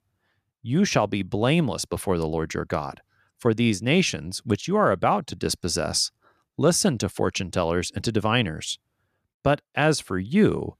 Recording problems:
none

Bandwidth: 14.5 kHz